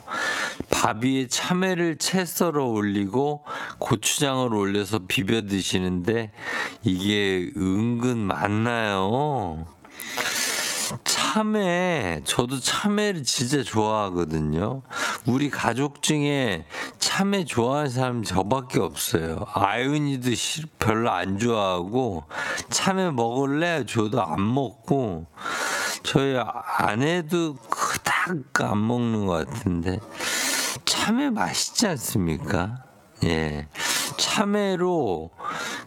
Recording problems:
squashed, flat; heavily
wrong speed, natural pitch; too slow; 0.6 times normal speed

